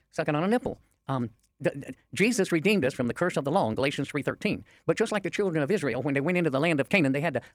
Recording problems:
wrong speed, natural pitch; too fast; 1.6 times normal speed

